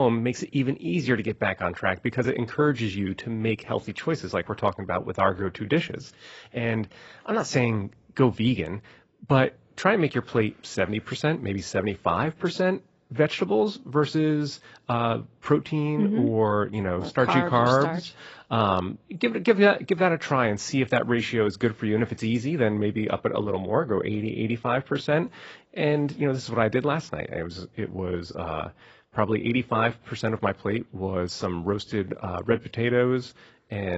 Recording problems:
garbled, watery; badly; nothing above 7.5 kHz
abrupt cut into speech; at the start and the end

